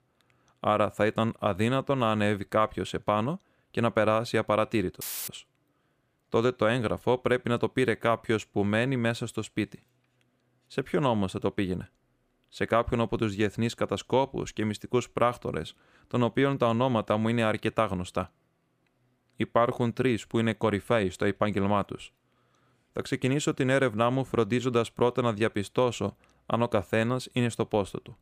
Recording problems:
audio cutting out; filled with static; at 5 s

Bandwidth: 15 kHz